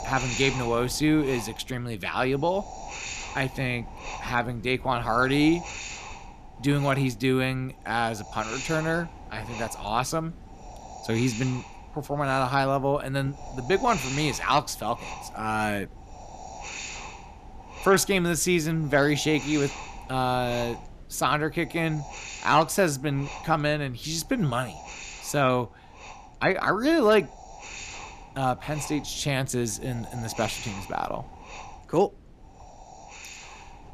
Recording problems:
wind noise on the microphone; occasional gusts; 10 dB below the speech

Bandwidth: 14.5 kHz